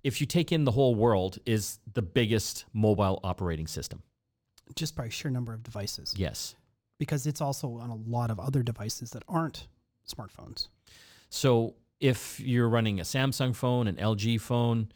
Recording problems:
none

